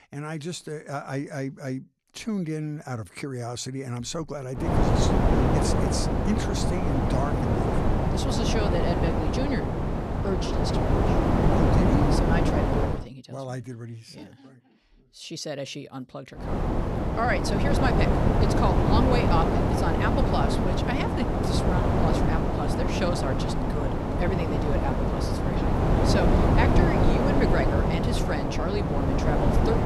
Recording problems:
wind noise on the microphone; heavy; from 4.5 to 13 s and from 16 s on; 4 dB above the speech

